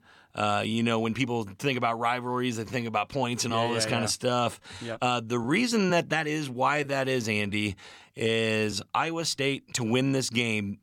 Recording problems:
uneven, jittery; strongly; from 0.5 to 10 s

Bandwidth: 17 kHz